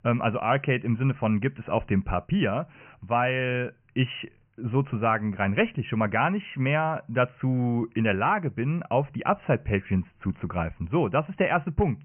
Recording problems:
high frequencies cut off; severe; nothing above 3 kHz

